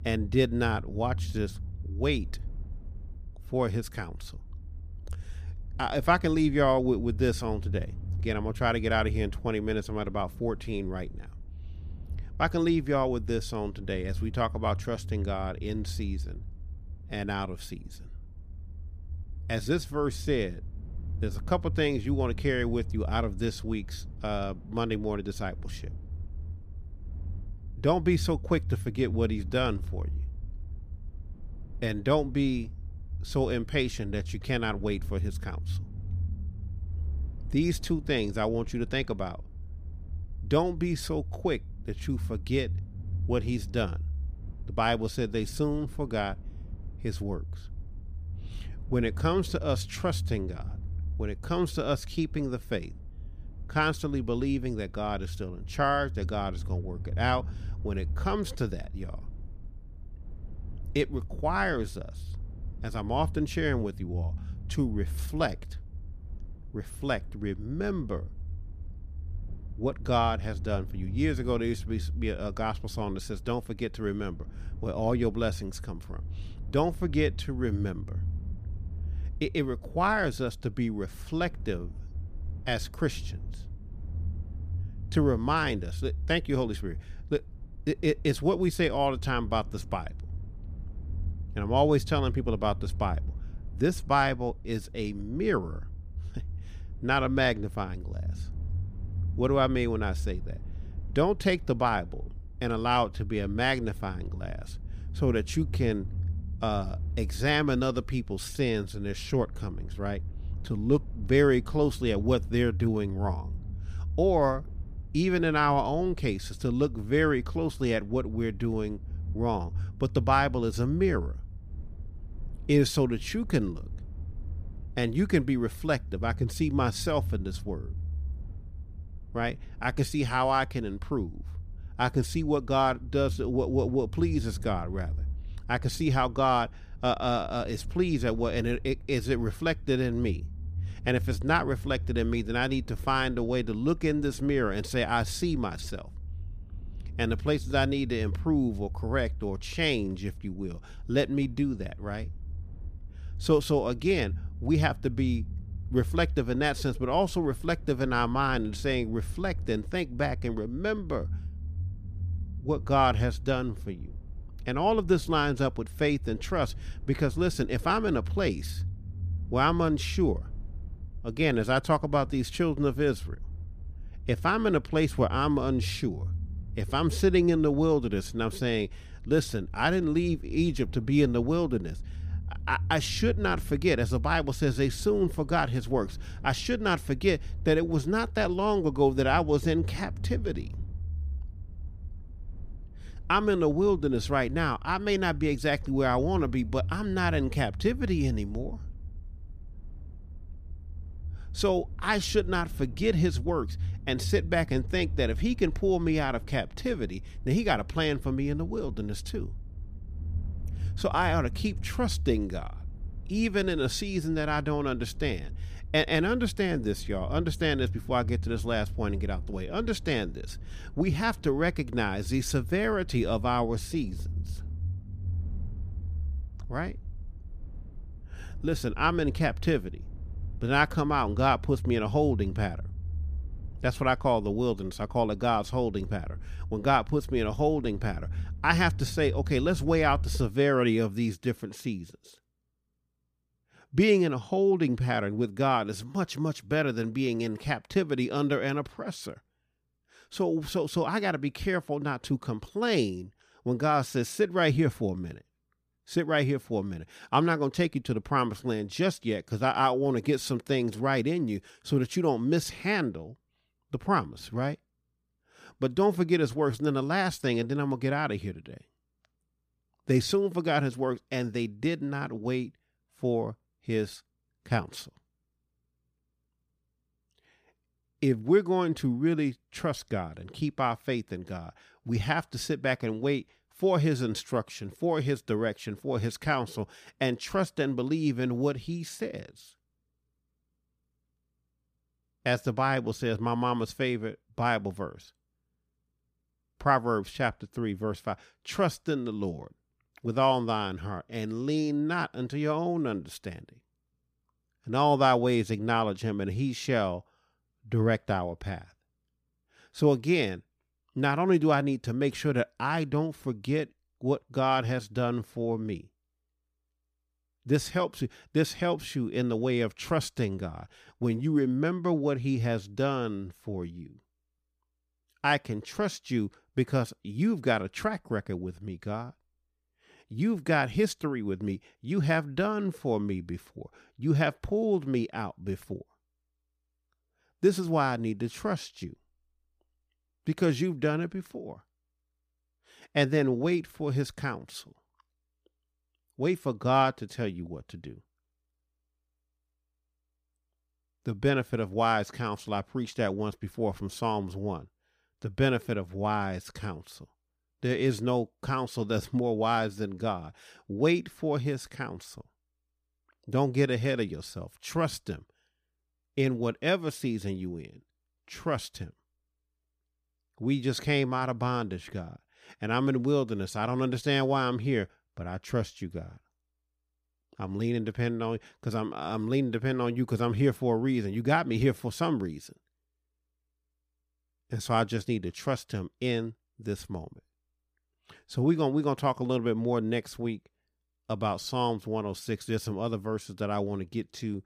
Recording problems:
low rumble; faint; until 4:01; 25 dB below the speech

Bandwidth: 15 kHz